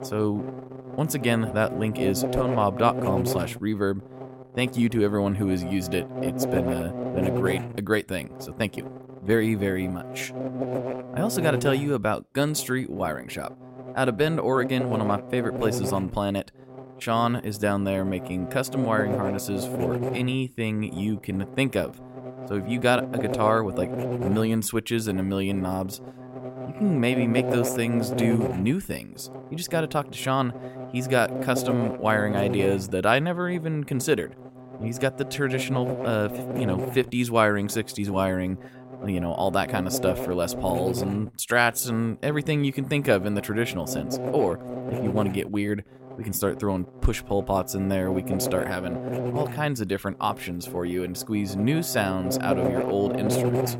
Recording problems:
electrical hum; loud; throughout; 60 Hz, 6 dB below the speech

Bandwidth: 16 kHz